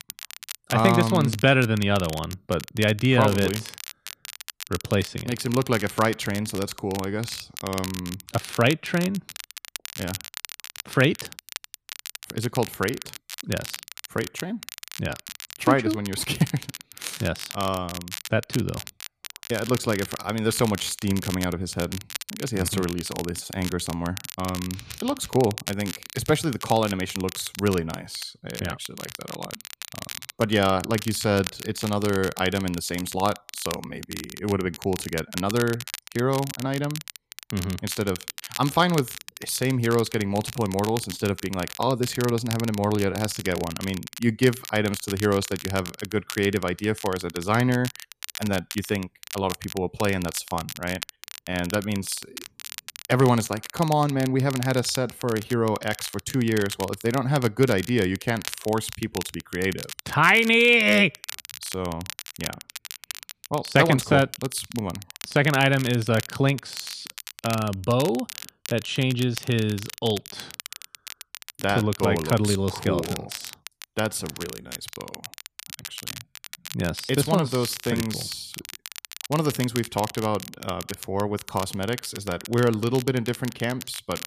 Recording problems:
crackle, like an old record; noticeable; 10 dB below the speech

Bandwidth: 14.5 kHz